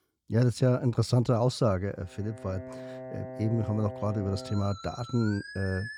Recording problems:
background music; noticeable; from 2.5 s on; 10 dB below the speech

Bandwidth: 18.5 kHz